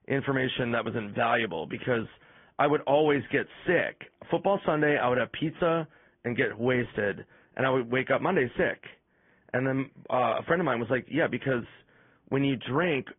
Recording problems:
high frequencies cut off; severe; nothing above 3.5 kHz
garbled, watery; slightly

